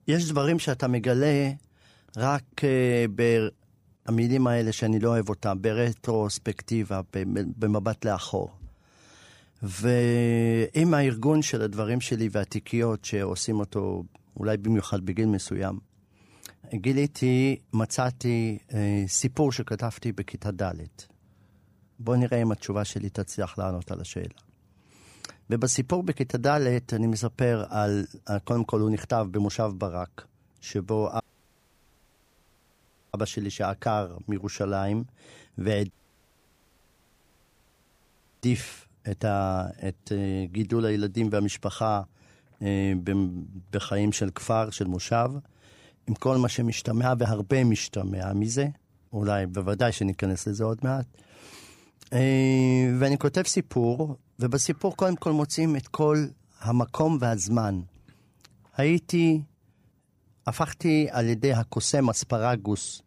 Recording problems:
audio cutting out; at 31 s for 2 s and at 36 s for 2.5 s

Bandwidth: 15 kHz